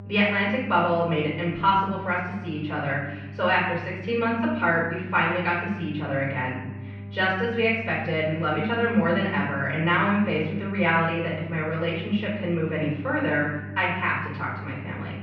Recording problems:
off-mic speech; far
muffled; very; fading above 2.5 kHz
room echo; noticeable; dies away in 0.9 s
electrical hum; faint; throughout; 50 Hz, 25 dB below the speech

